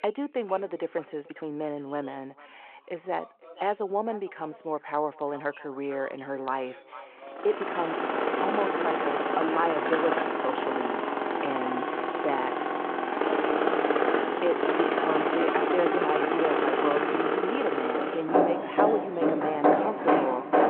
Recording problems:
echo of what is said; faint; throughout; 450 ms later, 20 dB below the speech
phone-call audio
machinery noise; very loud; from 7.5 s on; 5 dB above the speech
voice in the background; faint; throughout; 20 dB below the speech
uneven, jittery; strongly; from 1 to 16 s

